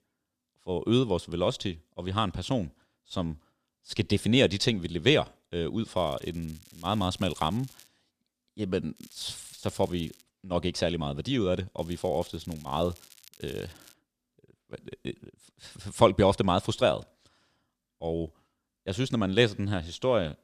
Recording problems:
crackling; faint; from 6 to 8 s, from 9 to 10 s and from 12 to 14 s; 25 dB below the speech

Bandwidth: 14.5 kHz